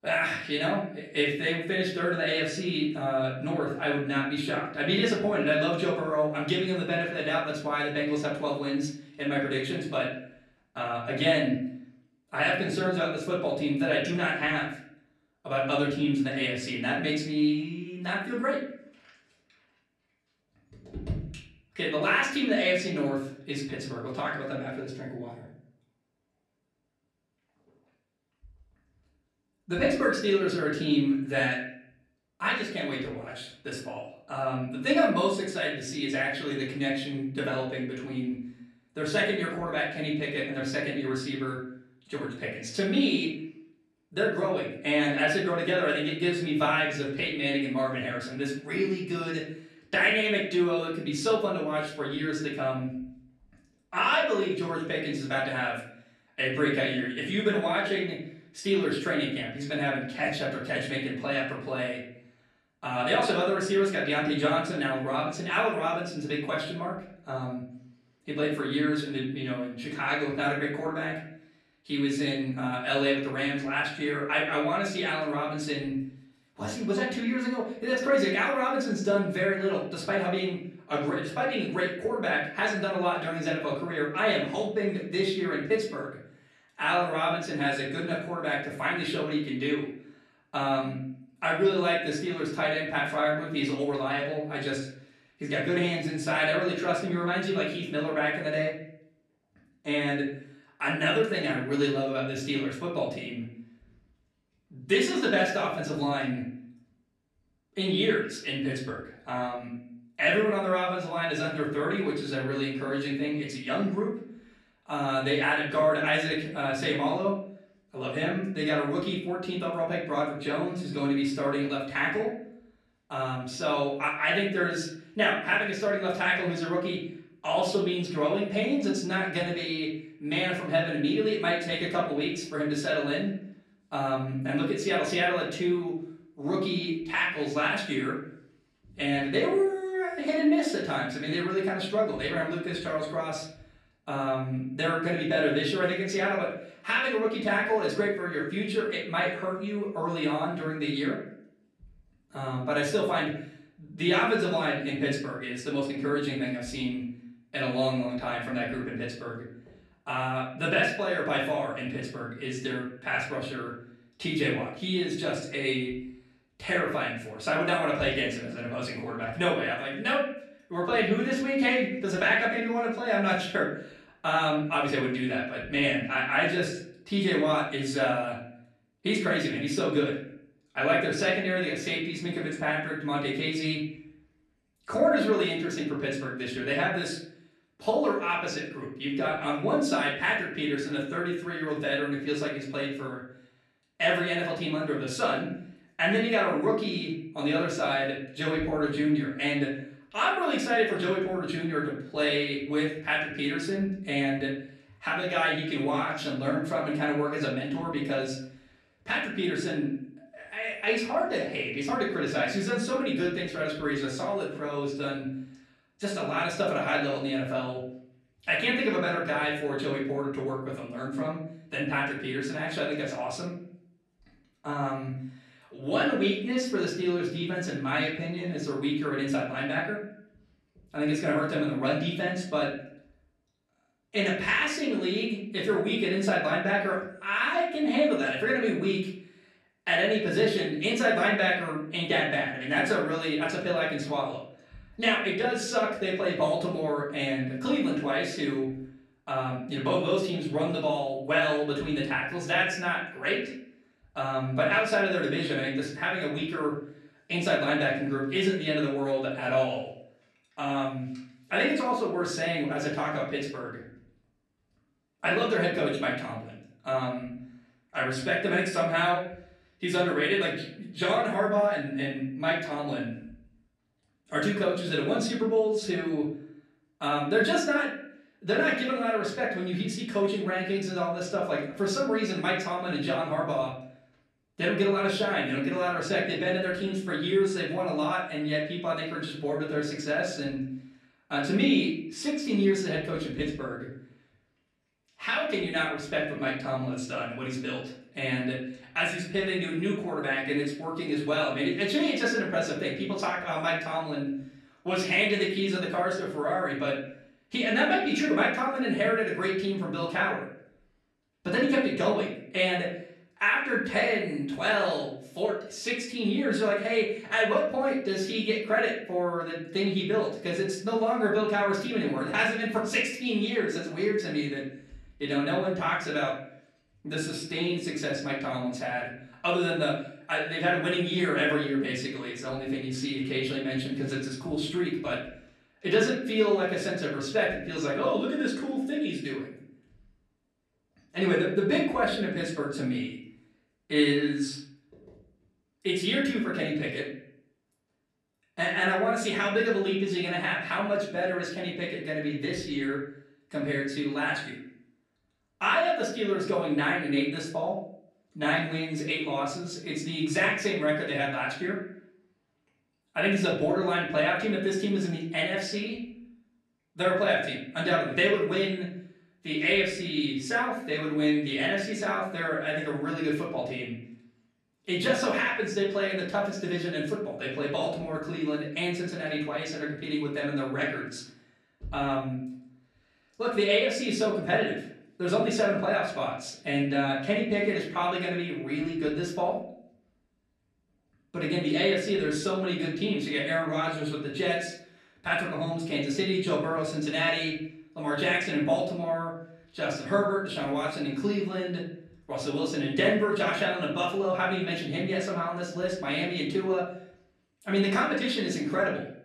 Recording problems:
off-mic speech; far
room echo; noticeable; dies away in 0.6 s

